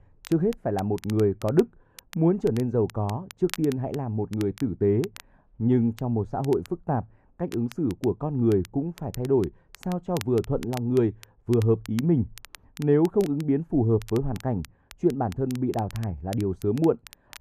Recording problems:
muffled; very; fading above 1.5 kHz
crackle, like an old record; faint; 20 dB below the speech

